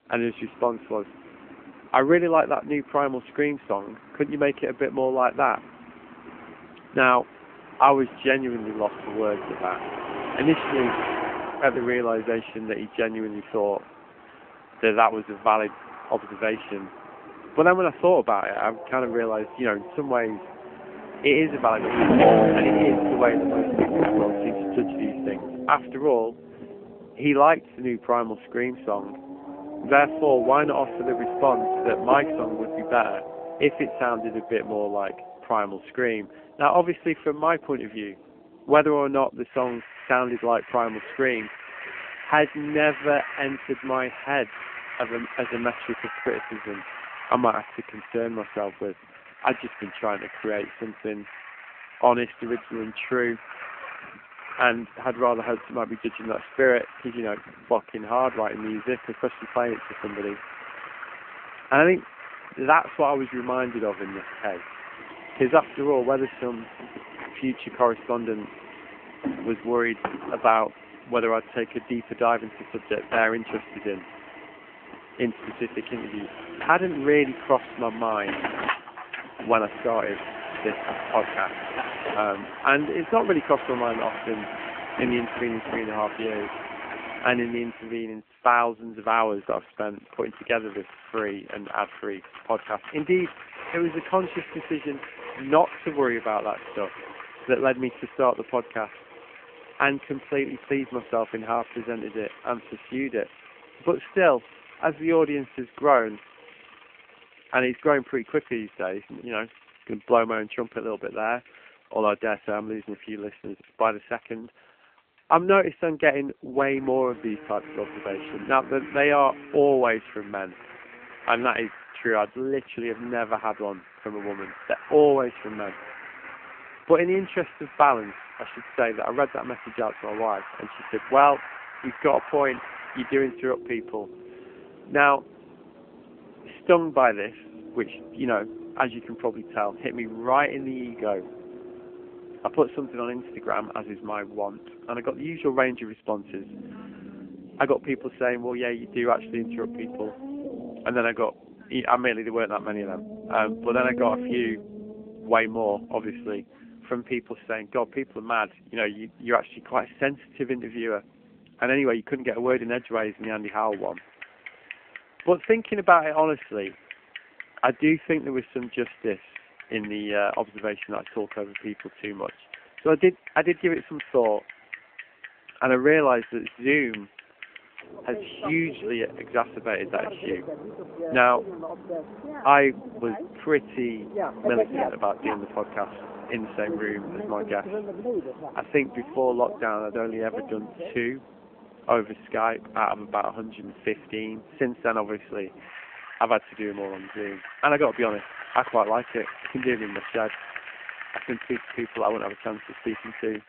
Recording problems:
phone-call audio
traffic noise; loud; throughout; 9 dB below the speech

